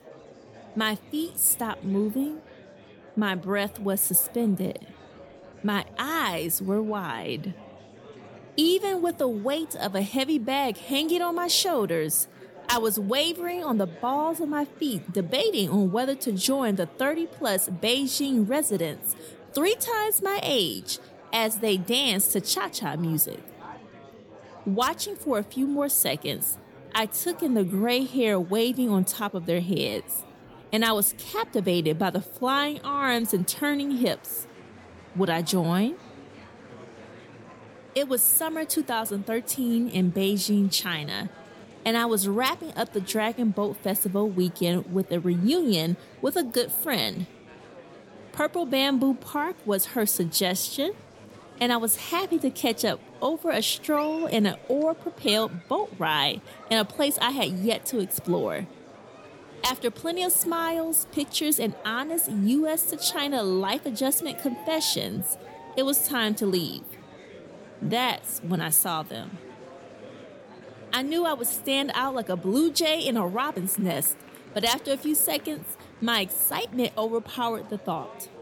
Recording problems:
murmuring crowd; faint; throughout; 20 dB below the speech

